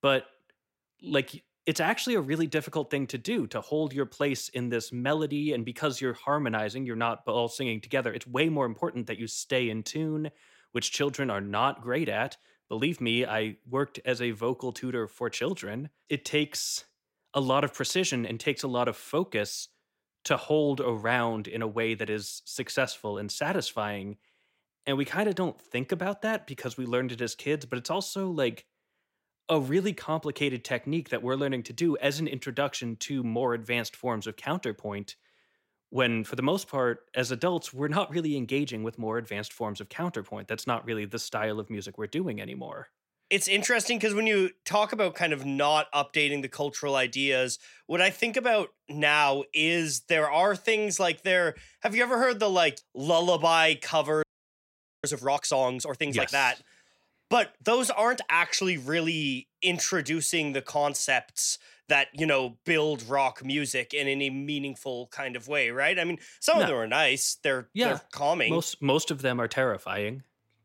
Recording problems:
audio freezing; at 54 s for 1 s

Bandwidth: 16 kHz